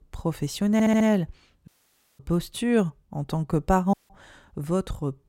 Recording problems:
audio stuttering; at 0.5 s
audio cutting out; at 1.5 s for 0.5 s and at 4 s

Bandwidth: 16 kHz